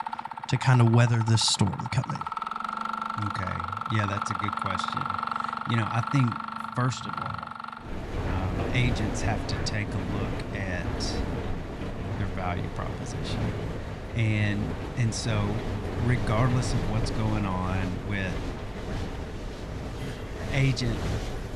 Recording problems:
machinery noise; loud; throughout; 4 dB below the speech

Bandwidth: 13.5 kHz